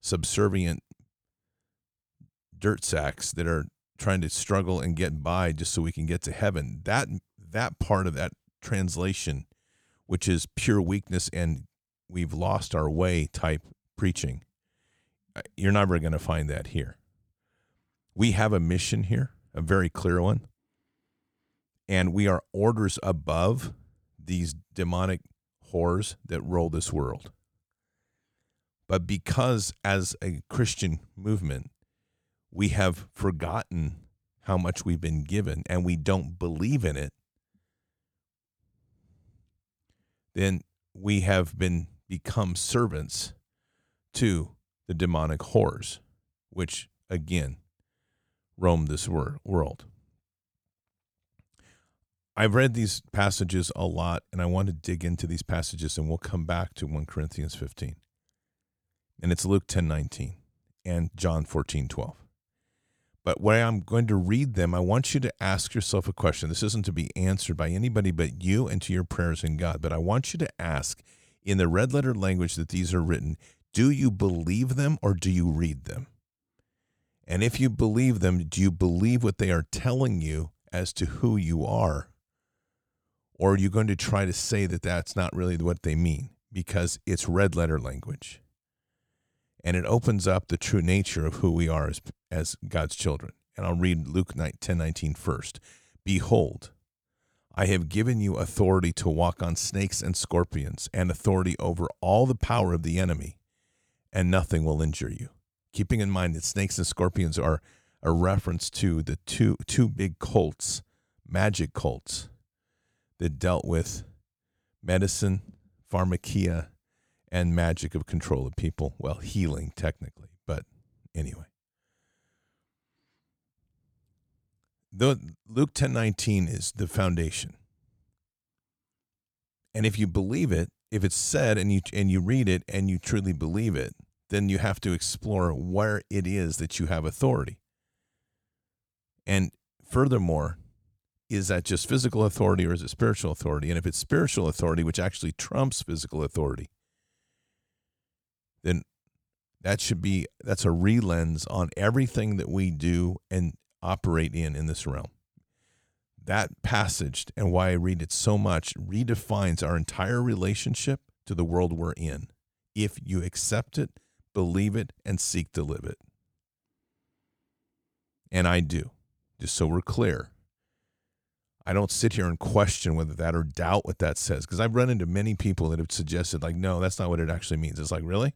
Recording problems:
none

